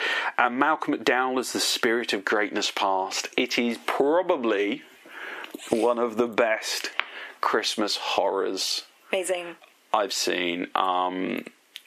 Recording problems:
squashed, flat; heavily
thin; very slightly; fading below 300 Hz

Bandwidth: 14.5 kHz